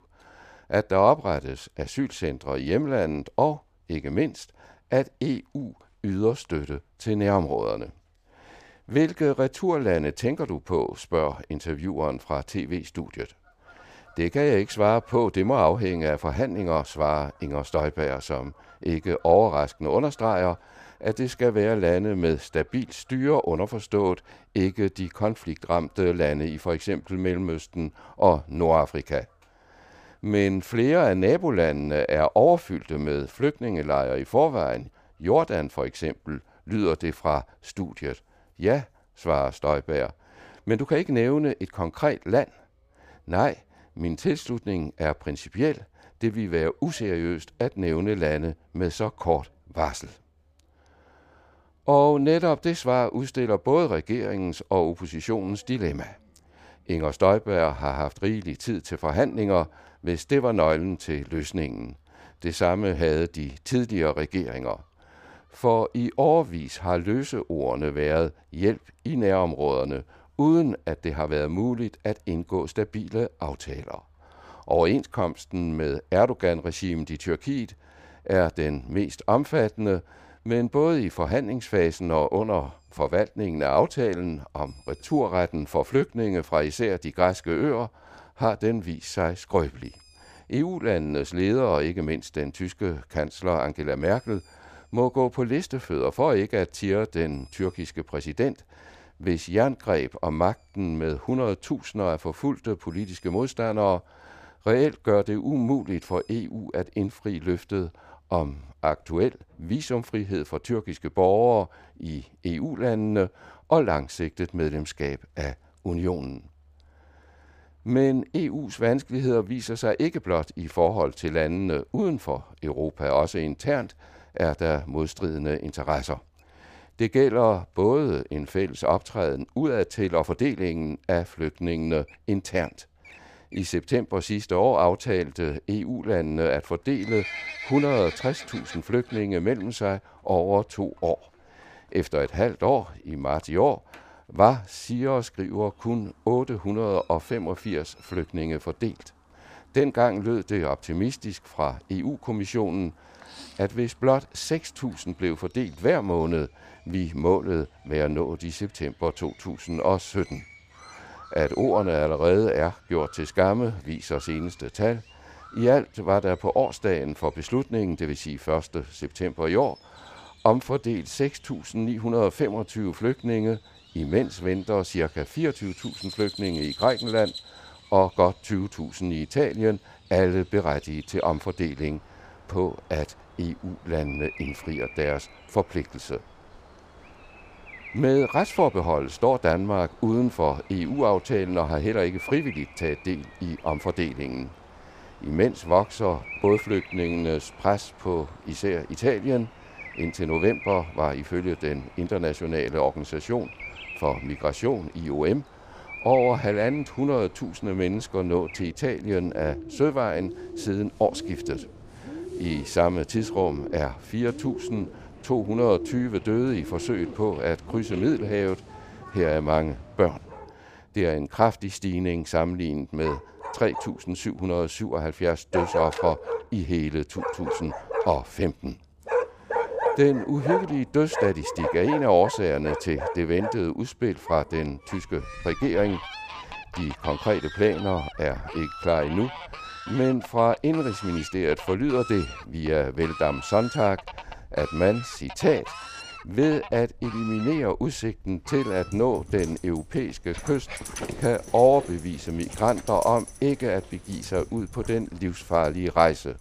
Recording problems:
animal sounds; noticeable; throughout; 10 dB below the speech

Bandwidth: 15 kHz